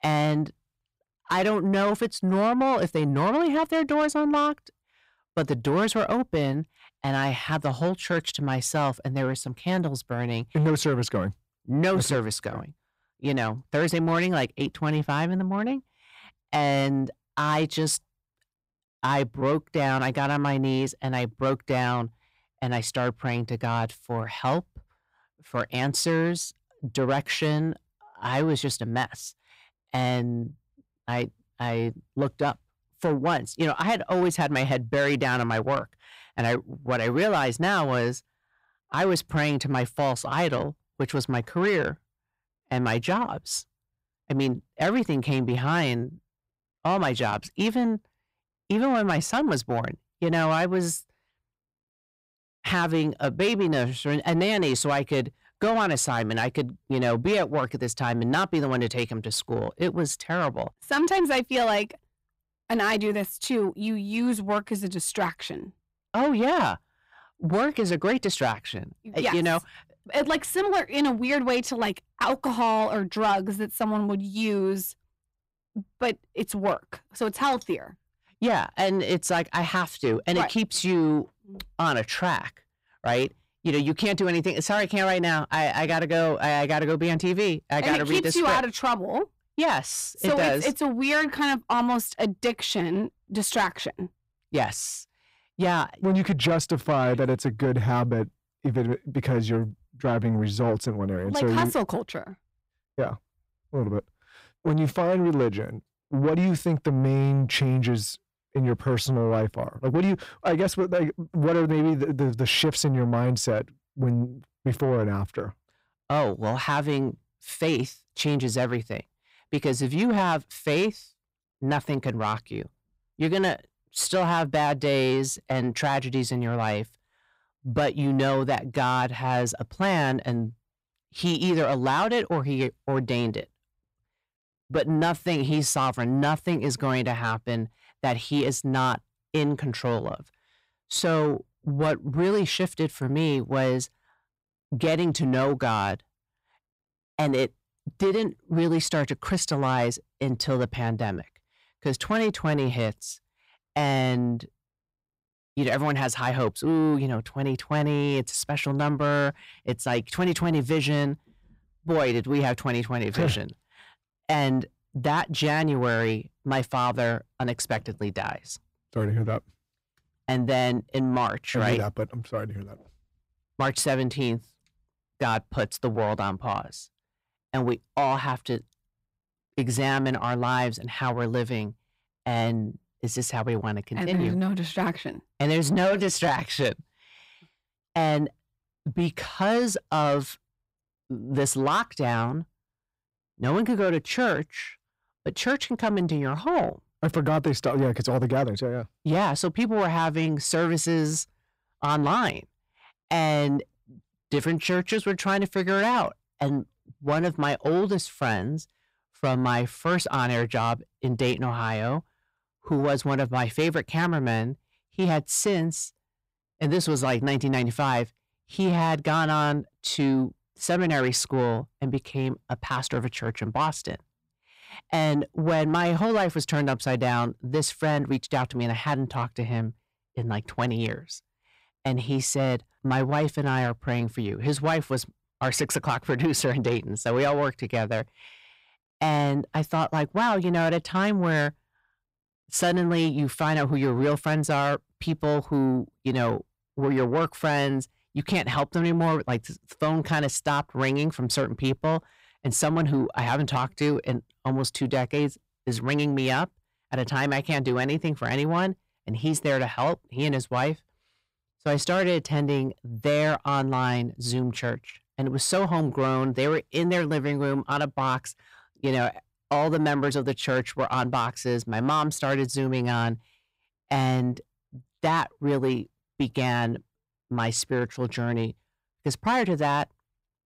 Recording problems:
distortion; slight; 10 dB below the speech

